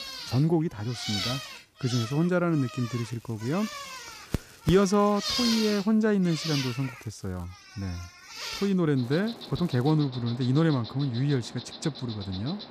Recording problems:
animal sounds; loud; throughout; 8 dB below the speech
crackling; faint; from 3 to 5.5 s, from 6.5 to 7.5 s and at 9 s; 30 dB below the speech

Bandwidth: 14.5 kHz